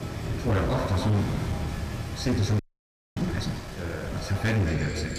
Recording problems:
distortion; heavy; 12% of the sound clipped
room echo; noticeable; dies away in 2.1 s
off-mic speech; somewhat distant
rain or running water; loud; throughout; 6 dB below the speech
murmuring crowd; faint; throughout; 25 dB below the speech
audio freezing; at 2.5 s for 0.5 s

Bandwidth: 15 kHz